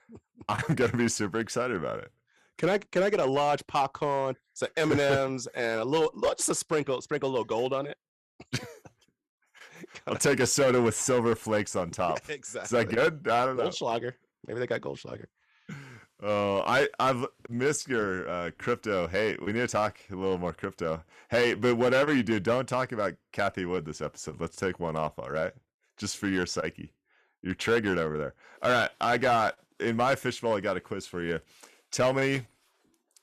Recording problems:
distortion; slight; 4% of the sound clipped

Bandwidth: 14 kHz